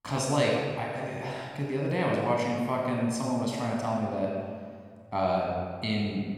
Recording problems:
room echo; noticeable; dies away in 1.5 s
off-mic speech; somewhat distant

